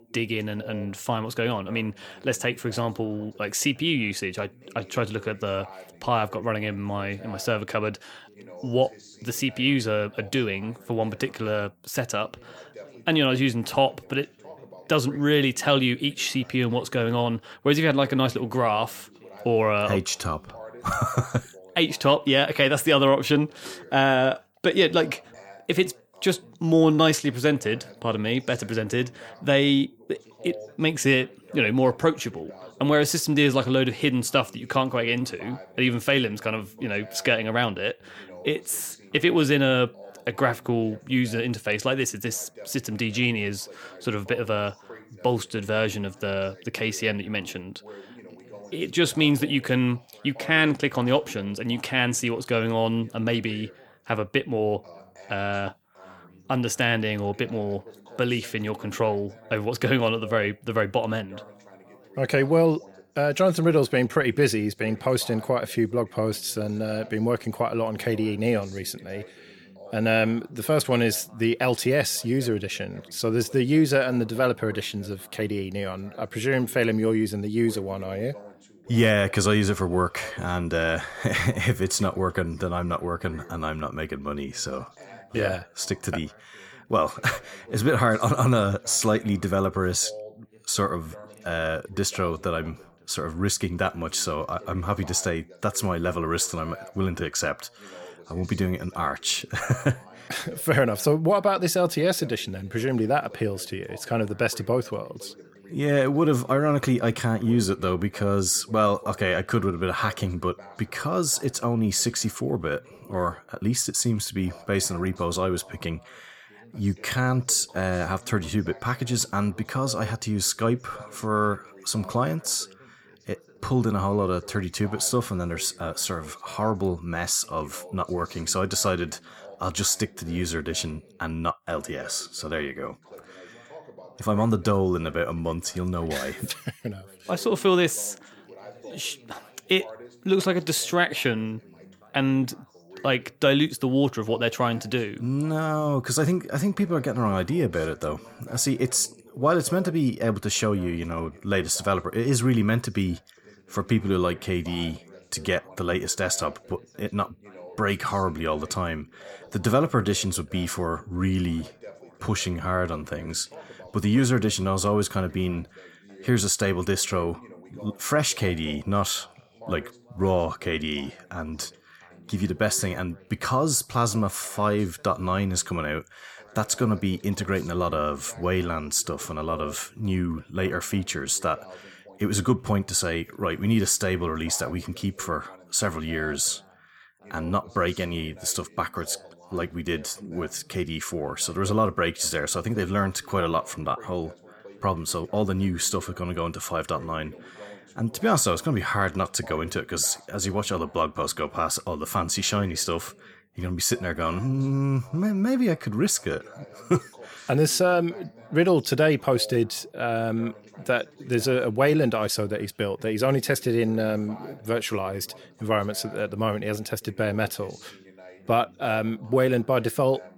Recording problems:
background chatter; faint; throughout; 2 voices, 20 dB below the speech

